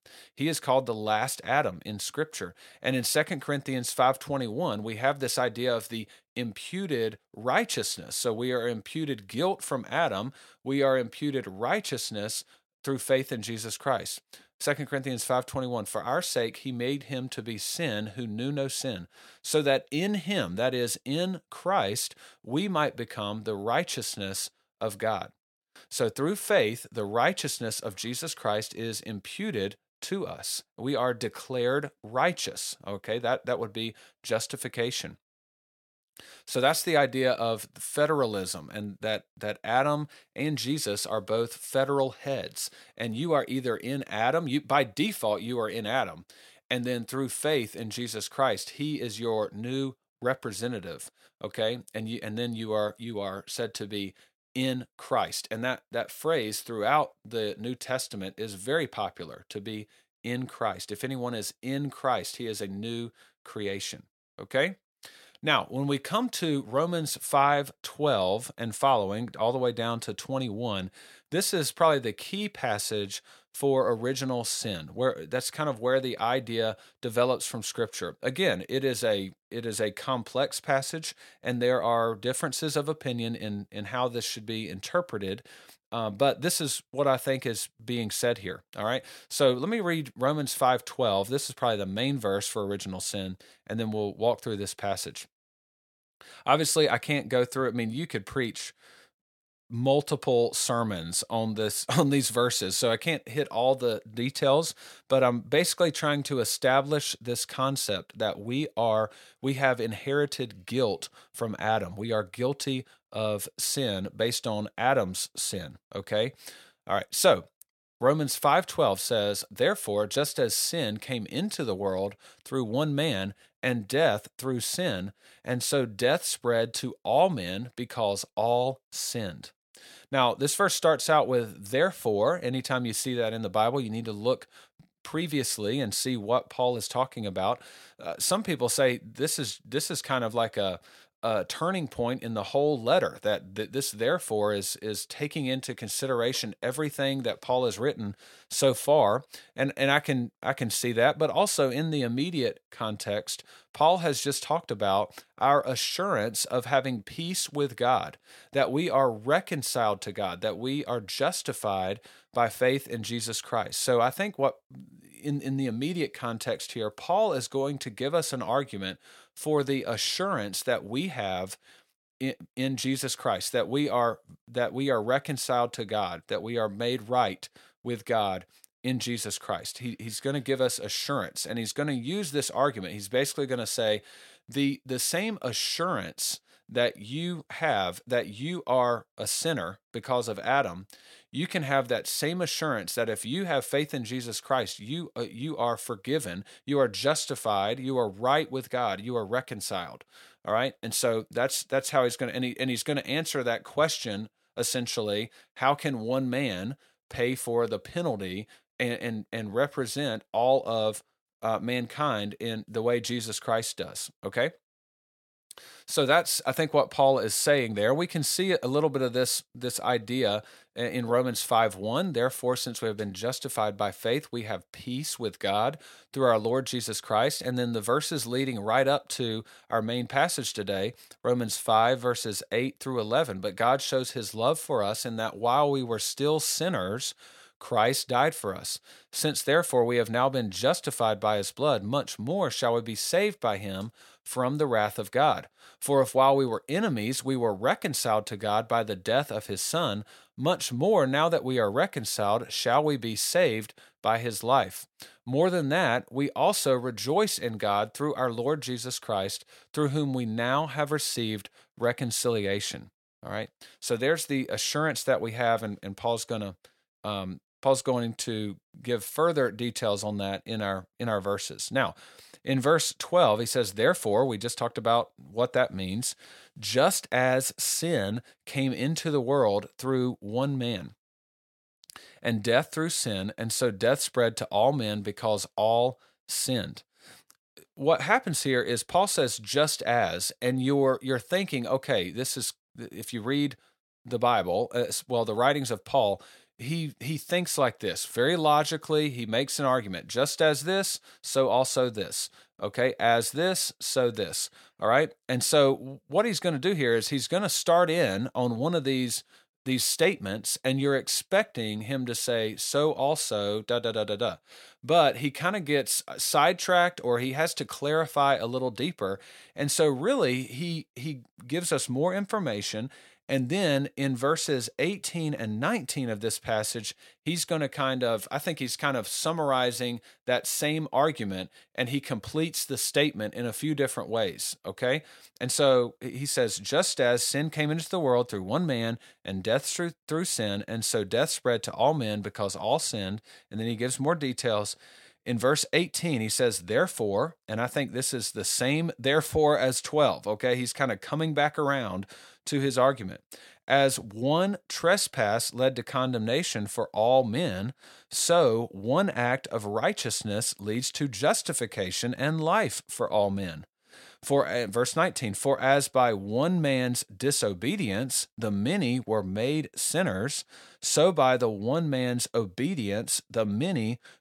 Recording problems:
none

